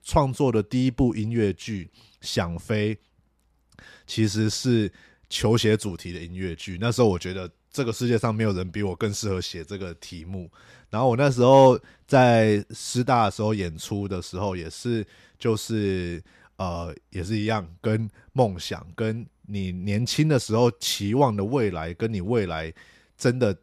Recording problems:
none

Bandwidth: 14 kHz